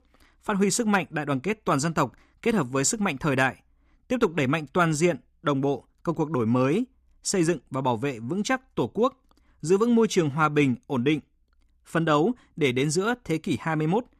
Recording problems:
none

